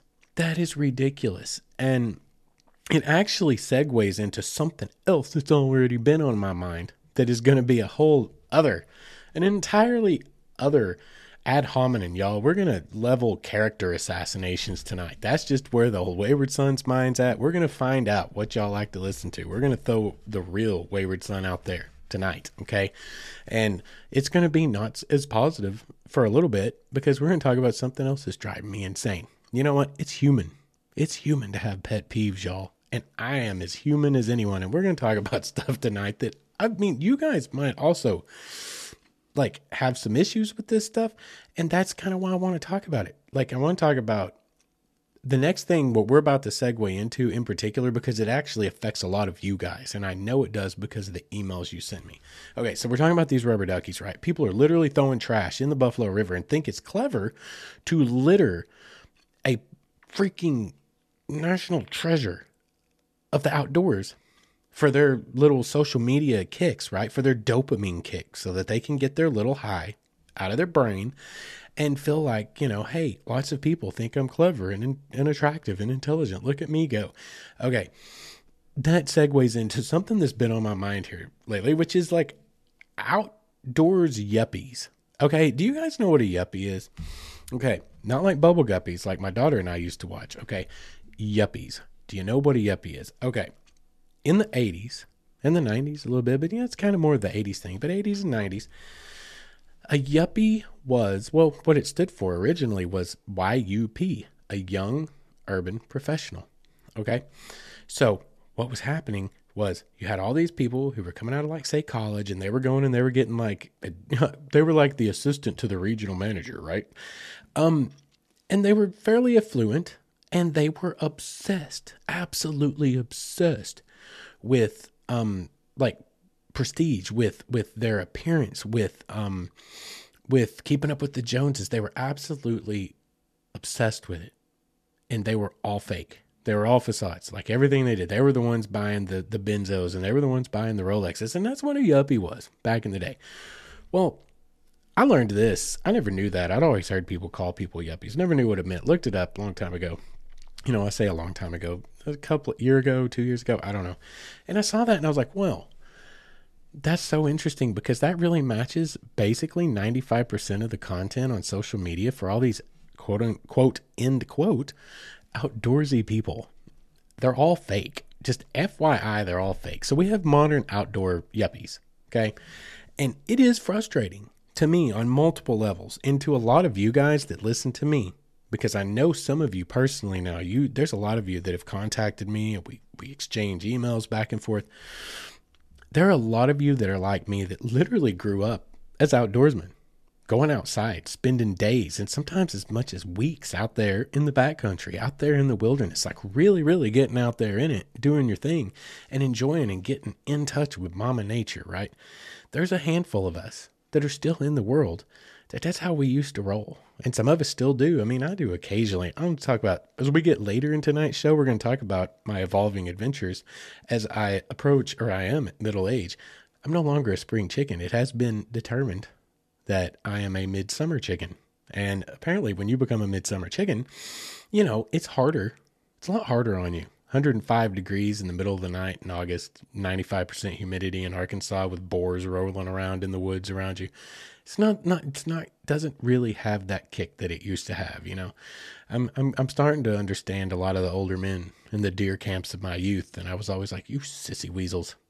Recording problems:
none

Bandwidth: 13.5 kHz